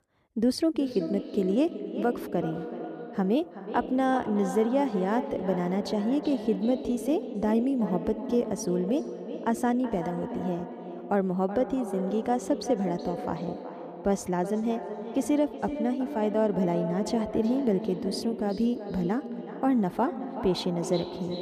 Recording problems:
echo of what is said; strong; throughout; 380 ms later, 8 dB below the speech

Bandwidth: 14.5 kHz